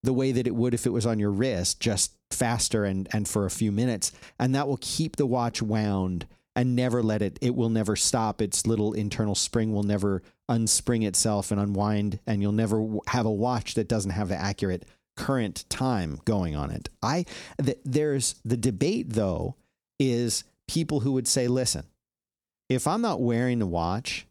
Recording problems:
none

